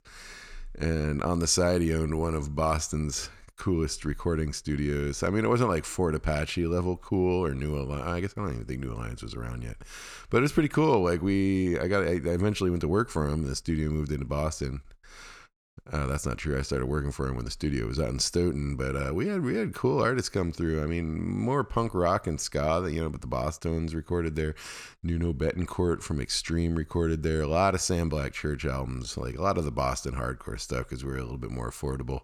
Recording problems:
none

